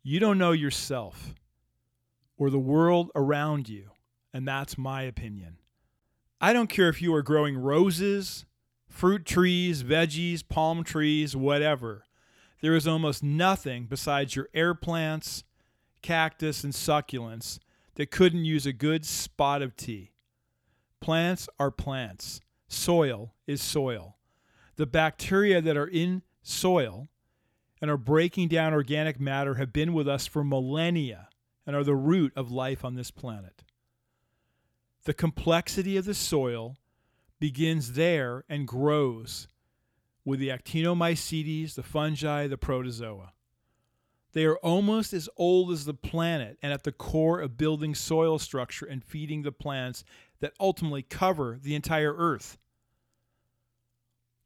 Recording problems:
none

